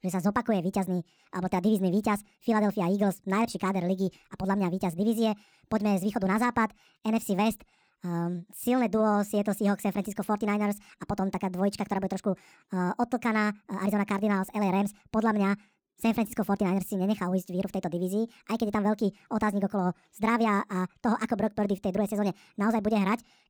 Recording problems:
wrong speed and pitch; too fast and too high; 1.6 times normal speed

